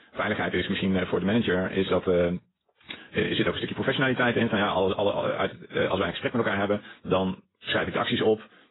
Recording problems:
garbled, watery; badly; nothing above 4 kHz
wrong speed, natural pitch; too fast; 1.5 times normal speed

